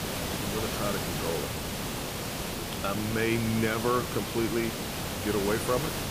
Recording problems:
hiss; loud; throughout; 2 dB below the speech

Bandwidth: 15 kHz